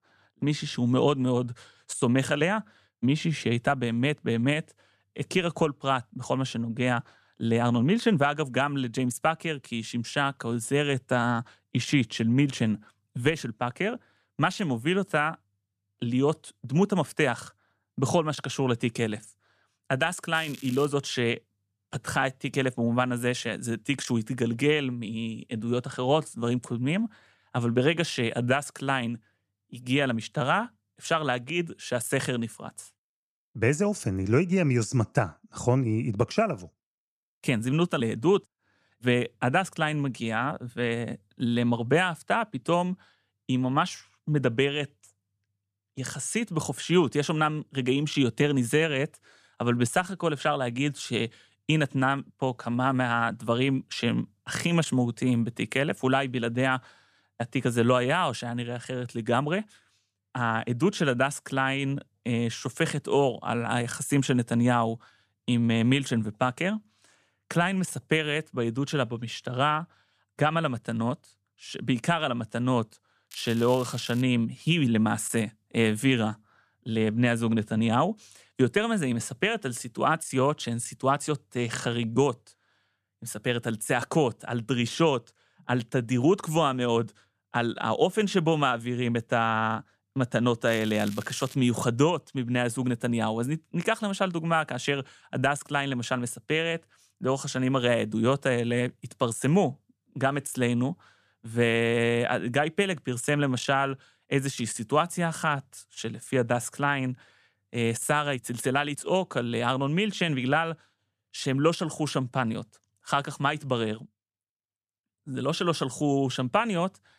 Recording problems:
crackling; noticeable; at 20 s, at 1:13 and at 1:31; 20 dB below the speech

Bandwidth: 14.5 kHz